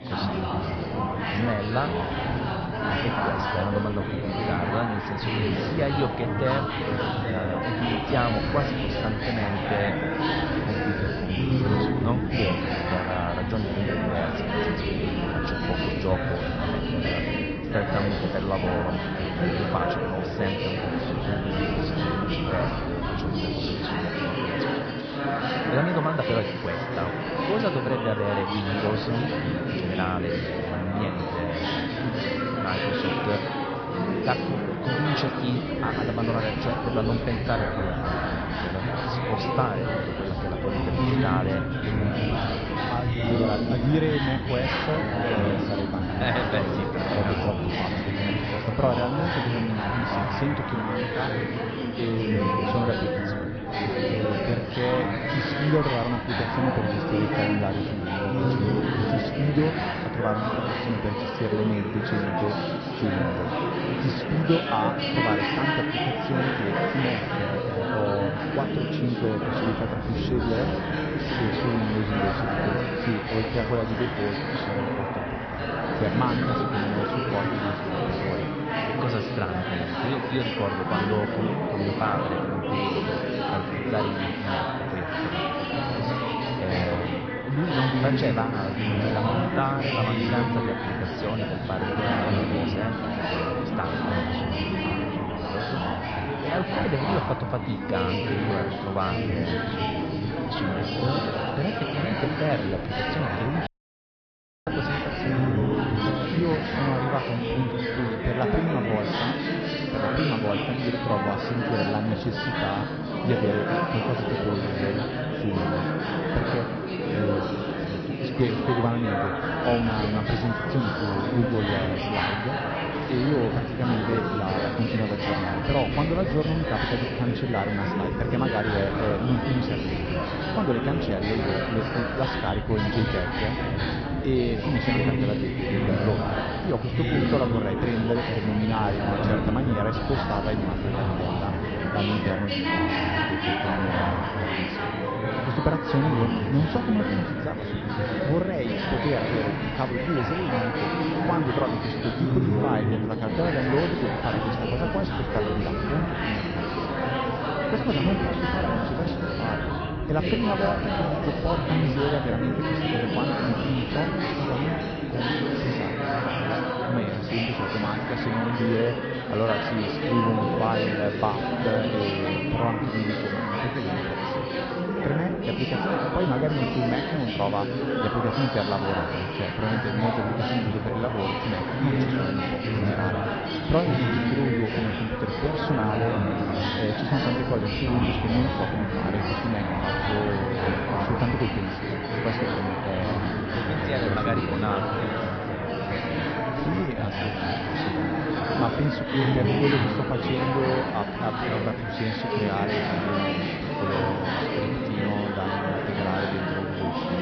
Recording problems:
high frequencies cut off; noticeable; nothing above 5.5 kHz
garbled, watery; slightly
chatter from many people; very loud; throughout; 2 dB above the speech
audio cutting out; at 1:44 for 1 s

